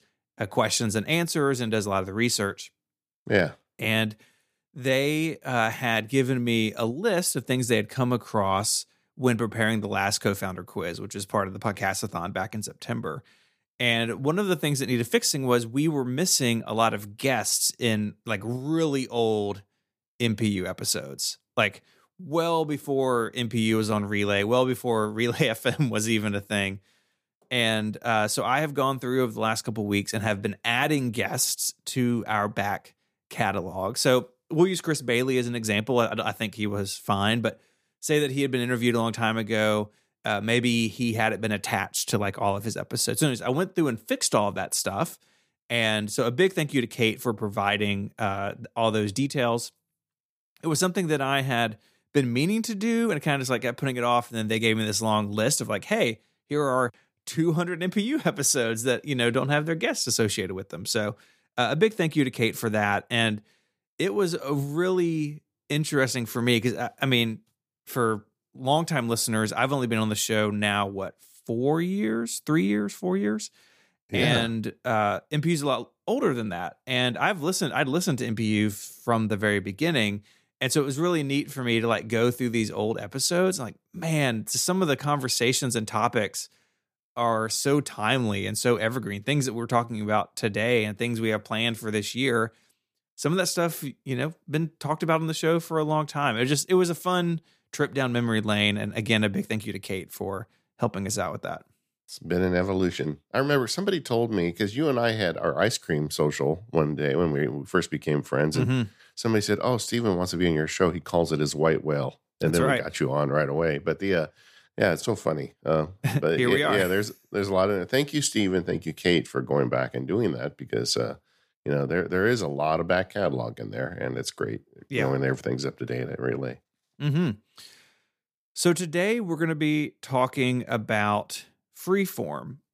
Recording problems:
none

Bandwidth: 15 kHz